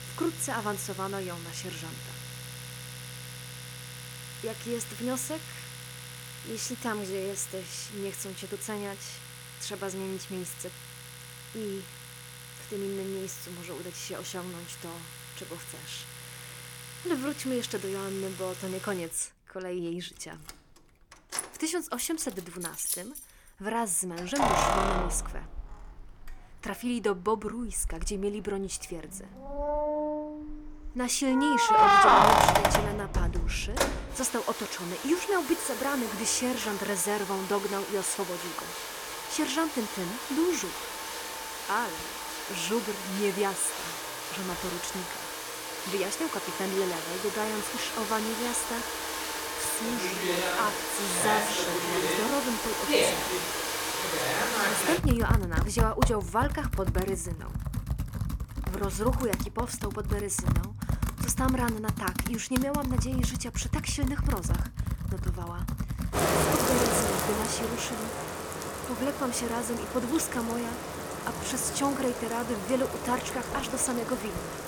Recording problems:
household noises; very loud; throughout; 1 dB above the speech

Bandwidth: 18 kHz